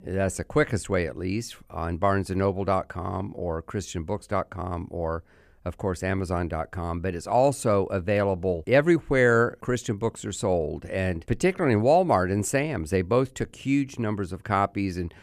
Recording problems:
none

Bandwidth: 14.5 kHz